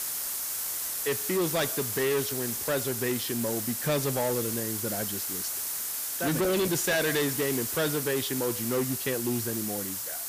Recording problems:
distortion; heavy; 17% of the sound clipped
hiss; loud; throughout; 1 dB below the speech

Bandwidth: 15 kHz